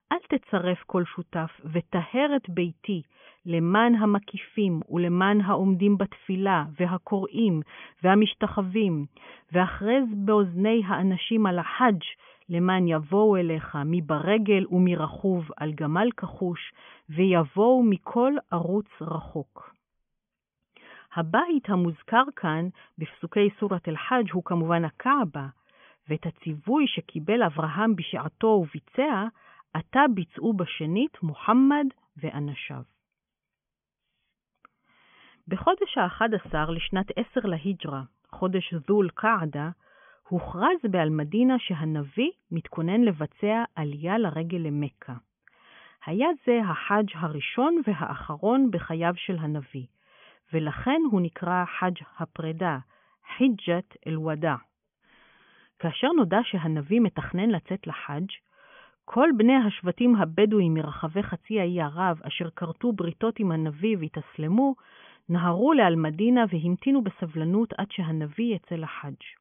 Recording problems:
high frequencies cut off; severe; nothing above 3.5 kHz

